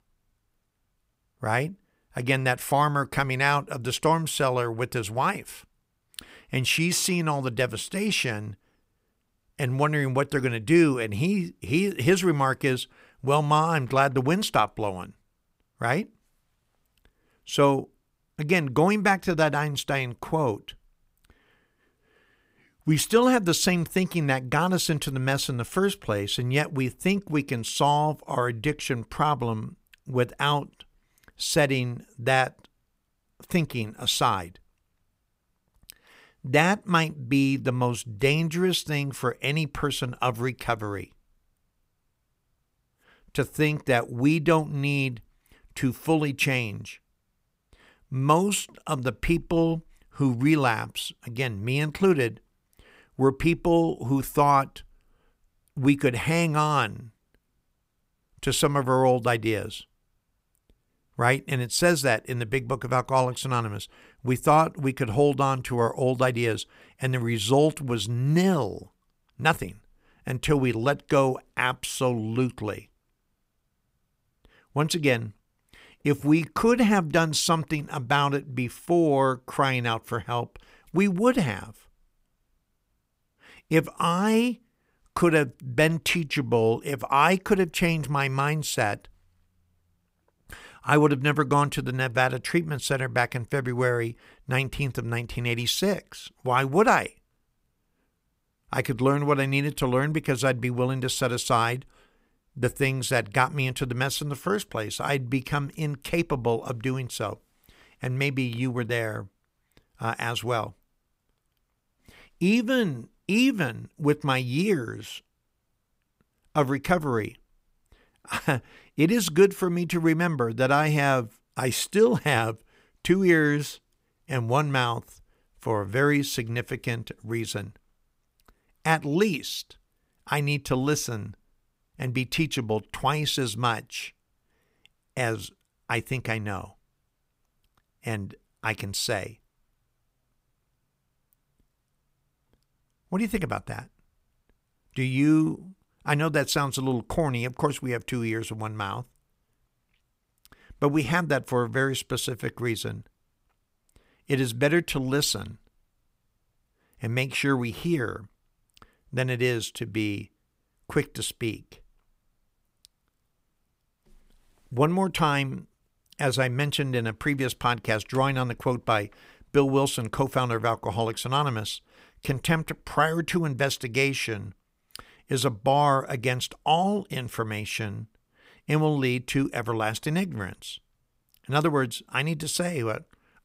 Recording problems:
none

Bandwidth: 15.5 kHz